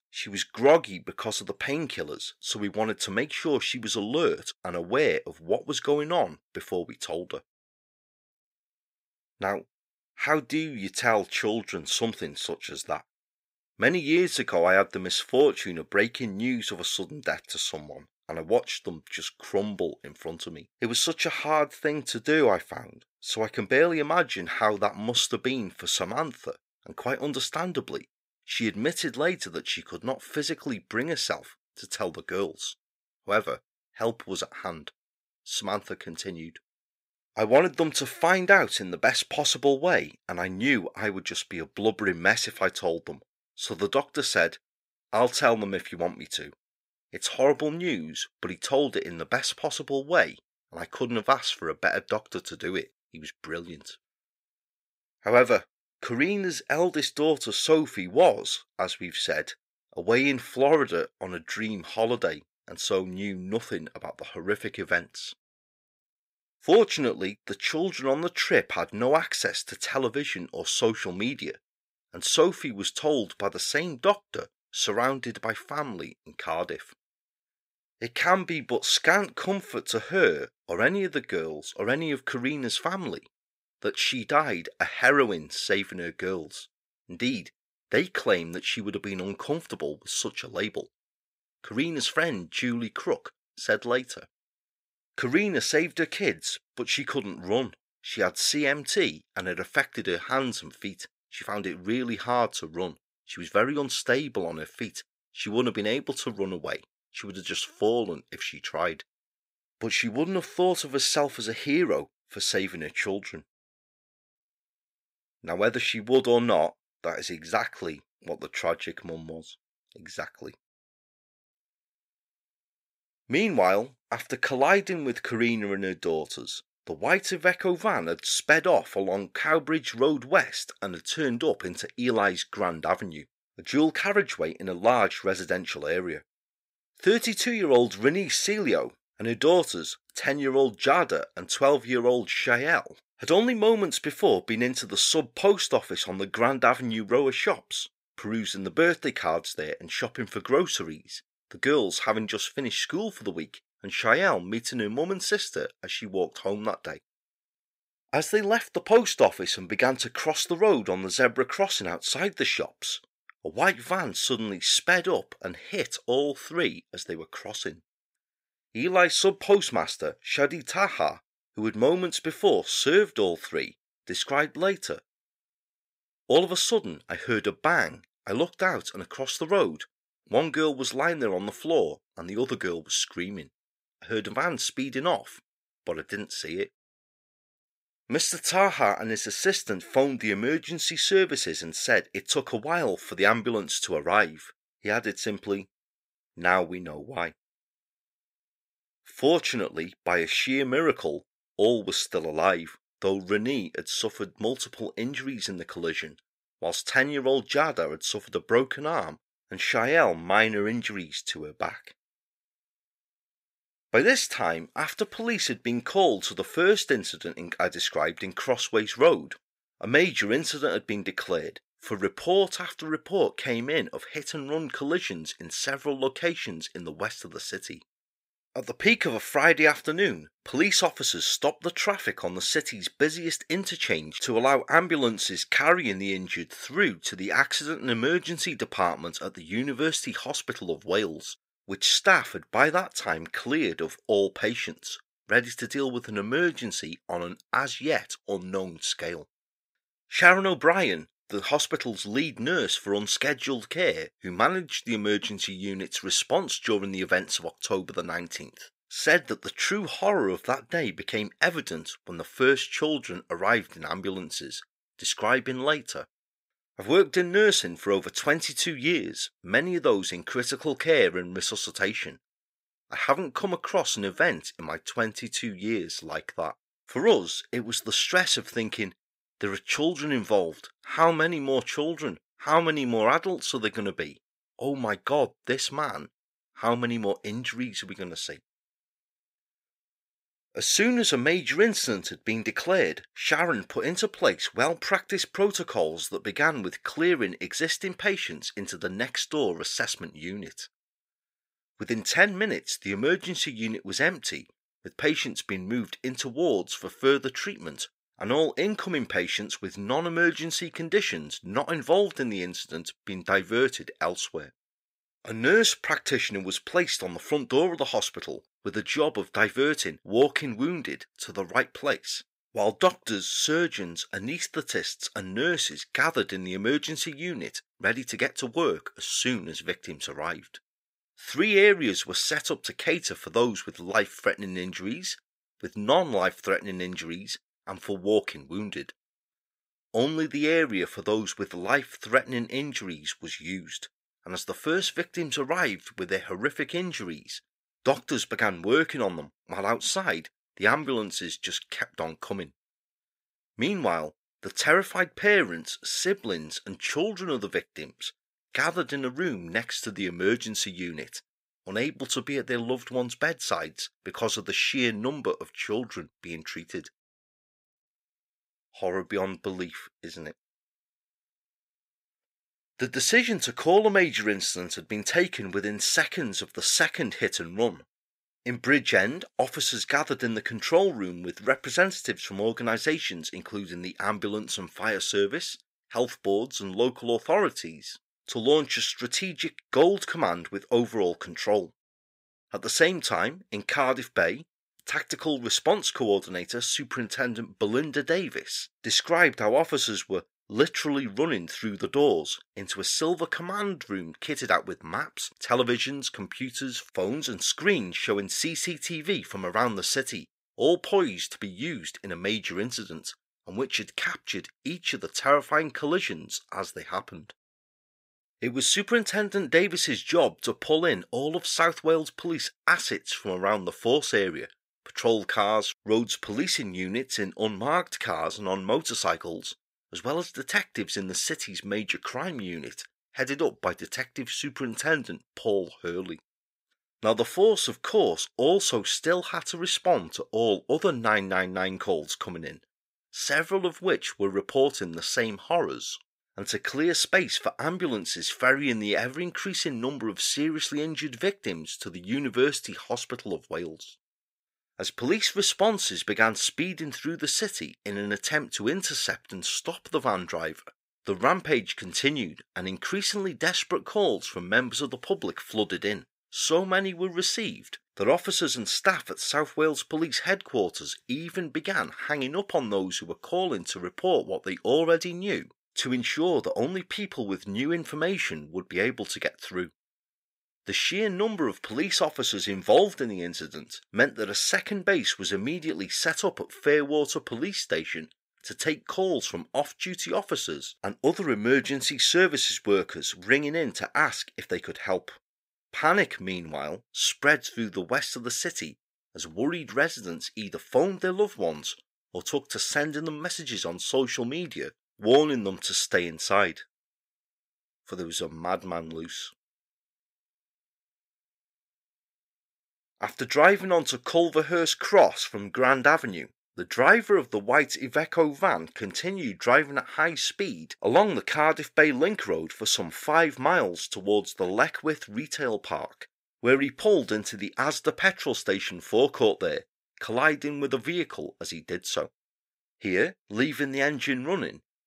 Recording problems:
thin; somewhat; fading below 1 kHz

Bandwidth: 15.5 kHz